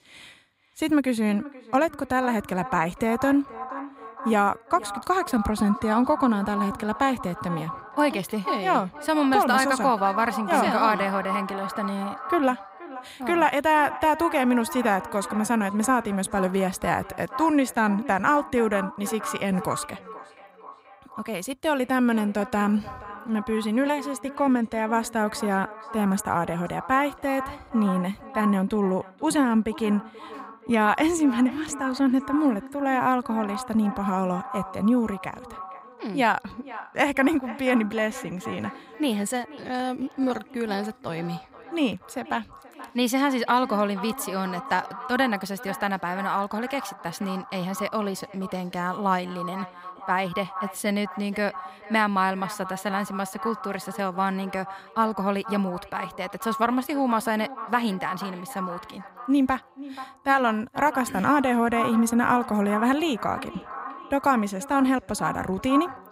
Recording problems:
echo of what is said; strong; throughout; 480 ms later, 10 dB below the speech

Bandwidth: 15.5 kHz